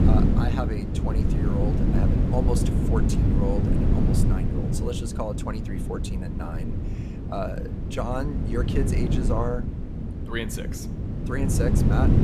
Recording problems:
wind noise on the microphone; heavy; 1 dB below the speech

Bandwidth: 14.5 kHz